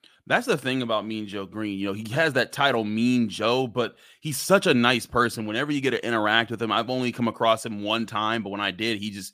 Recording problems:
none

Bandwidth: 15 kHz